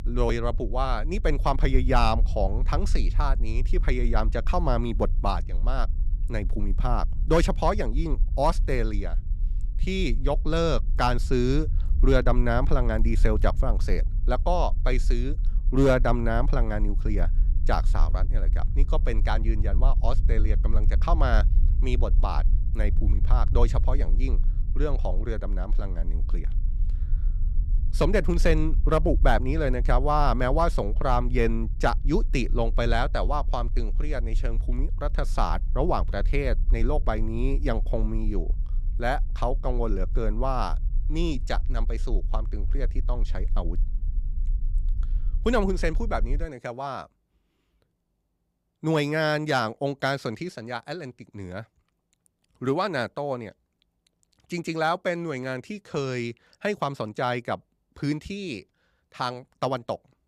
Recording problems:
low rumble; faint; until 46 s; 20 dB below the speech

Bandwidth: 15.5 kHz